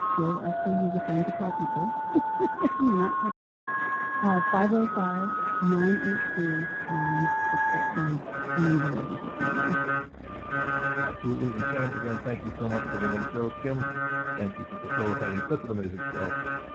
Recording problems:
garbled, watery; badly; nothing above 7.5 kHz
muffled; very slightly; fading above 2.5 kHz
alarms or sirens; loud; throughout; as loud as the speech
animal sounds; noticeable; throughout; 15 dB below the speech
audio cutting out; at 3.5 s

